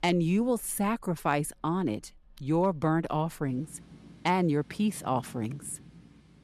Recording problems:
rain or running water; faint; throughout; 25 dB below the speech

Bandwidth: 13.5 kHz